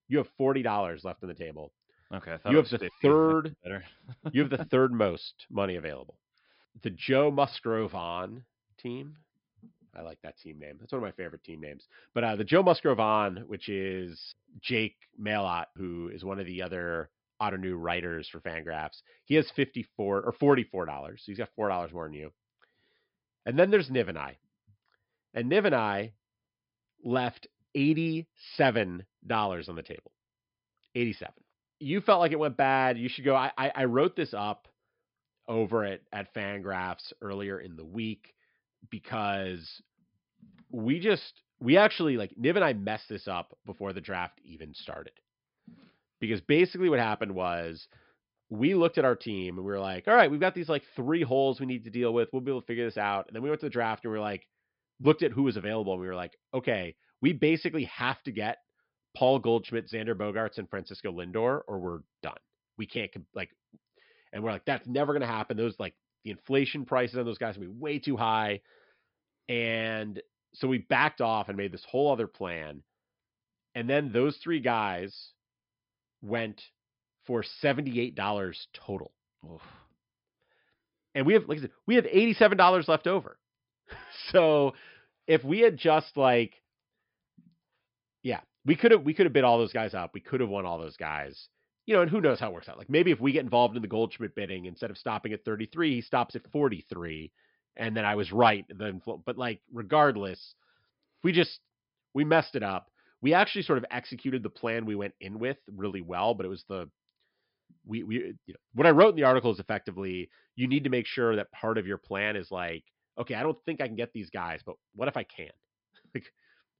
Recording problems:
high frequencies cut off; noticeable; nothing above 5.5 kHz

